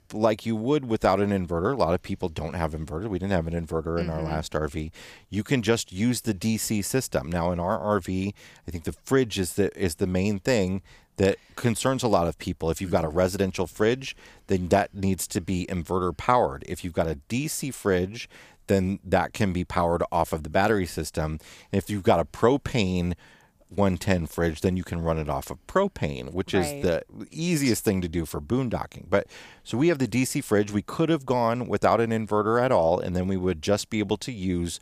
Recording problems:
none

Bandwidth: 15 kHz